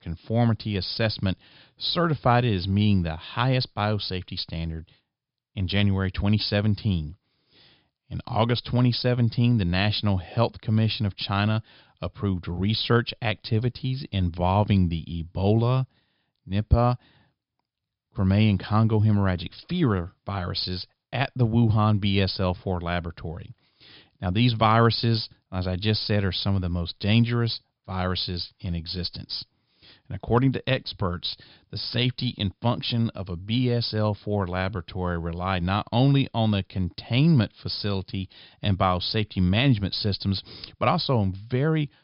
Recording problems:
high frequencies cut off; noticeable; nothing above 5.5 kHz

